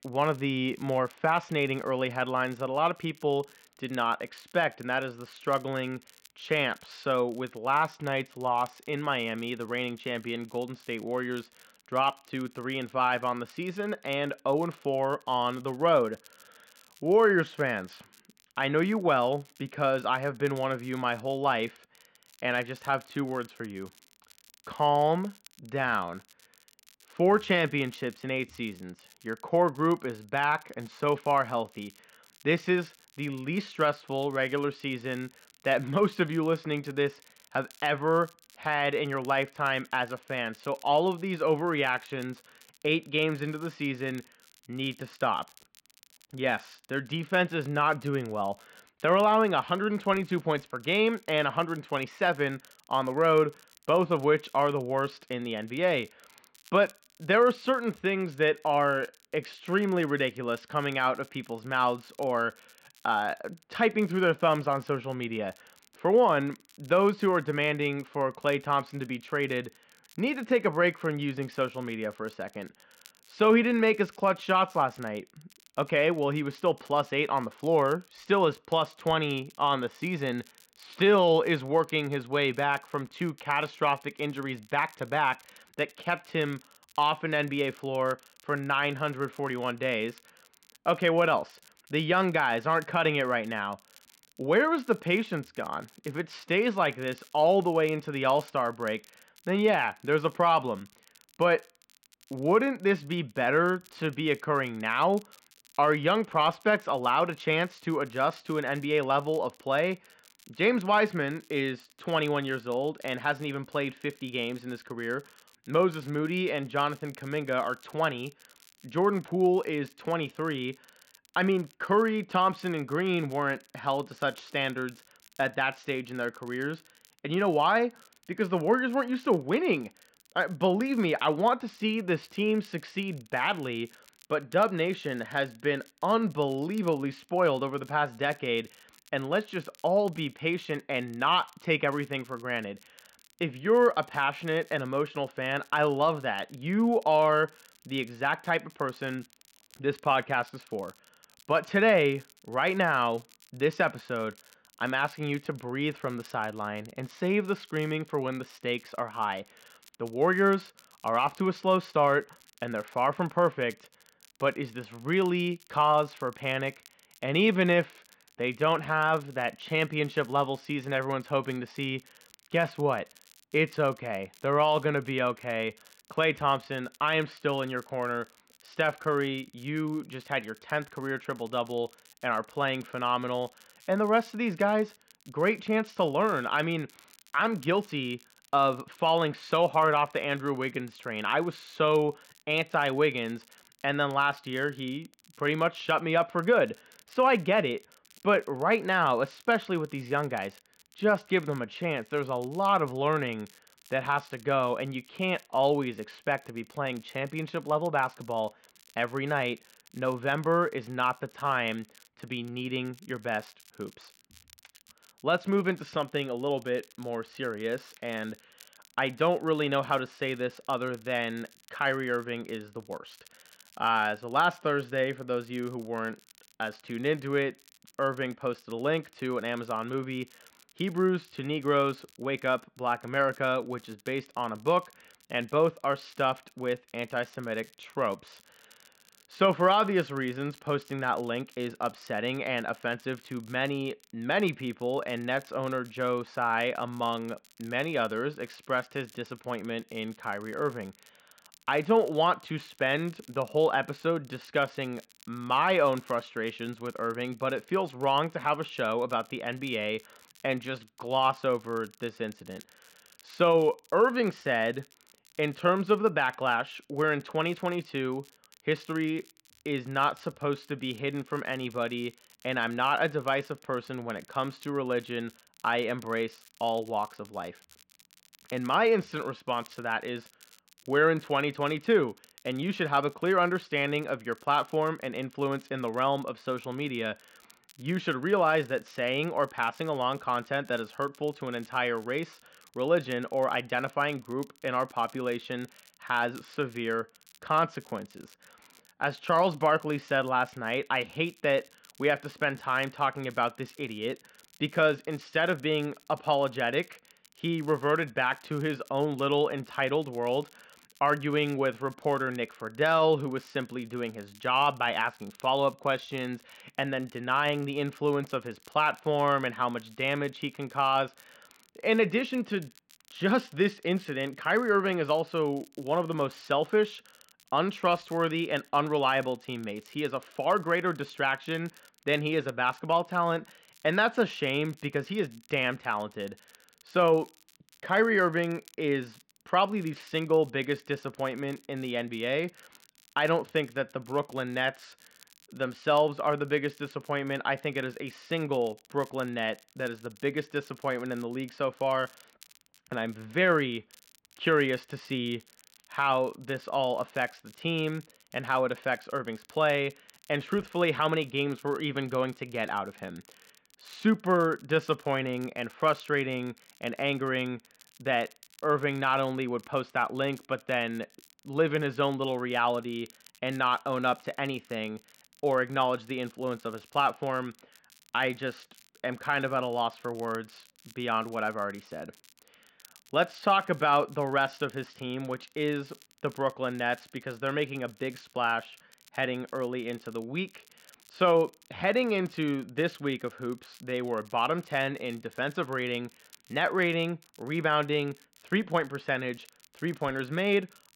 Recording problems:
muffled; slightly; fading above 3.5 kHz
crackle, like an old record; faint; 30 dB below the speech

